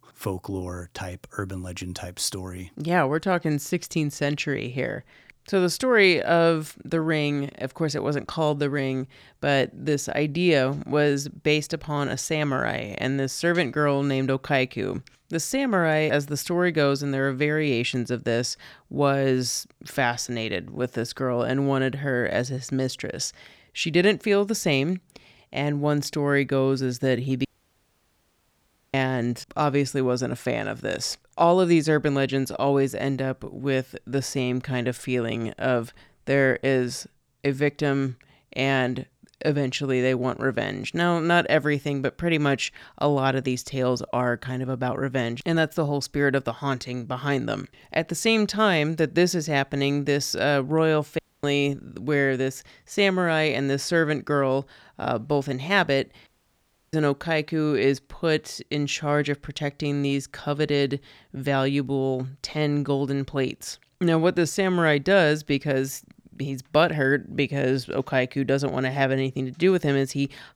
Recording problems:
audio cutting out; at 27 s for 1.5 s, at 51 s and at 56 s for 0.5 s

